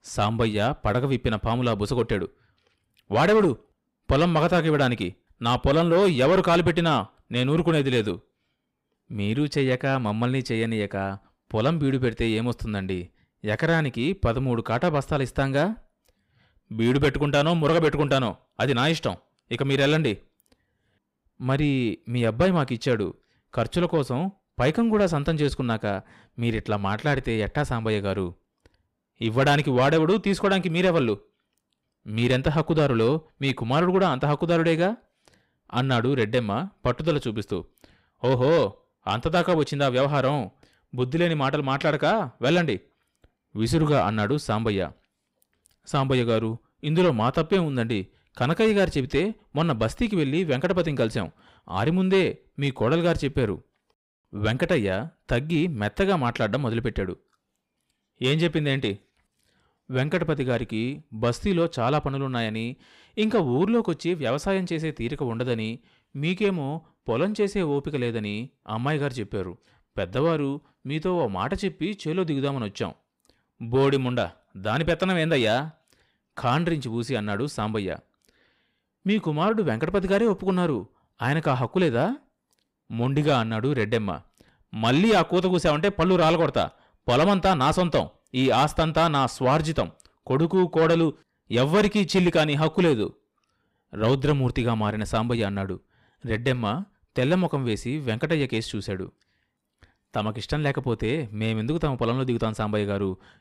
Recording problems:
distortion; slight; 10 dB below the speech

